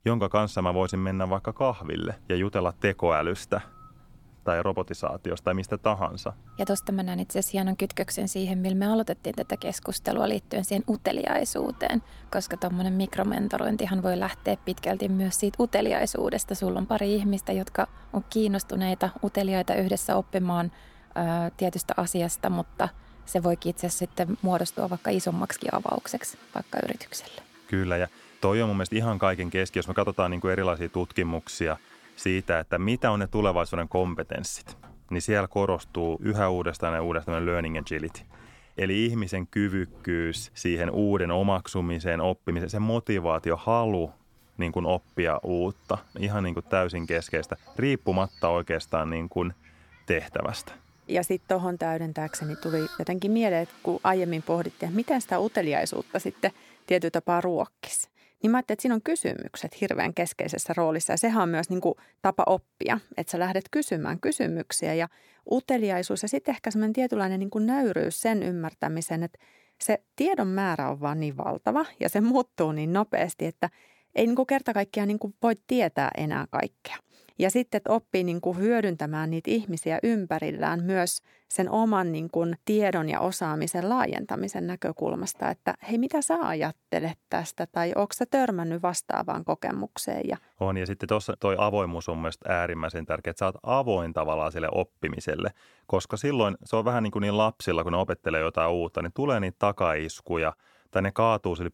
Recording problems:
animal sounds; faint; until 57 s; 25 dB below the speech

